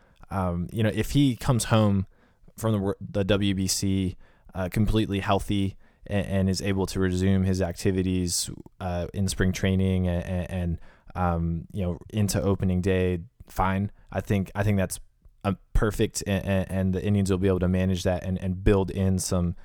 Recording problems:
none

